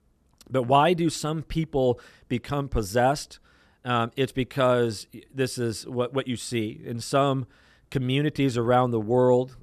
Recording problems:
none

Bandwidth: 14 kHz